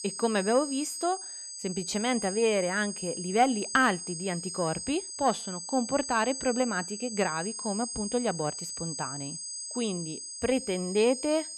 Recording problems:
high-pitched whine; loud; throughout; 8 kHz, 6 dB below the speech

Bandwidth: 14.5 kHz